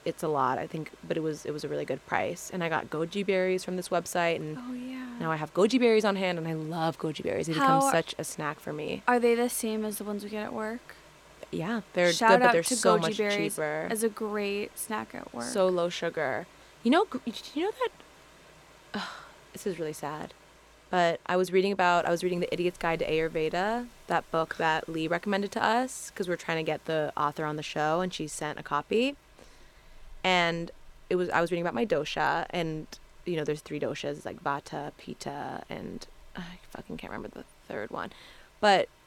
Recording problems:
rain or running water; faint; throughout; 25 dB below the speech

